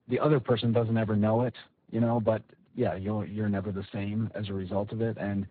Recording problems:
garbled, watery; badly; nothing above 4 kHz

